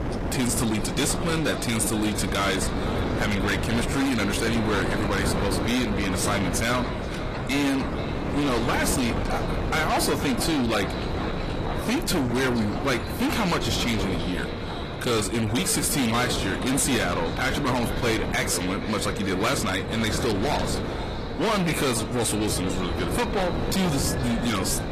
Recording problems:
distortion; heavy; 6 dB below the speech
echo of what is said; noticeable; throughout; 470 ms later, 15 dB below the speech
garbled, watery; slightly; nothing above 14.5 kHz
wind noise on the microphone; heavy; 7 dB below the speech
animal sounds; noticeable; throughout; 15 dB below the speech

